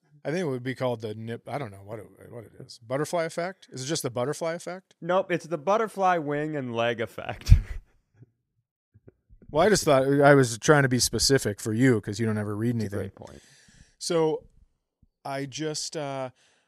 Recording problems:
none

